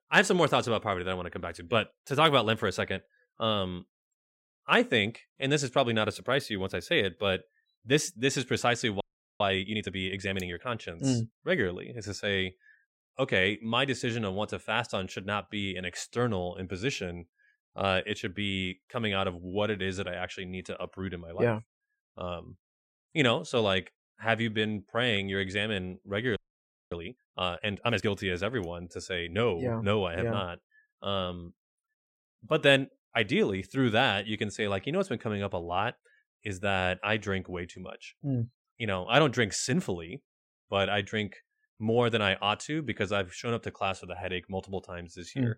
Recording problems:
audio freezing; at 9 s and at 26 s for 0.5 s

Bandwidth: 16 kHz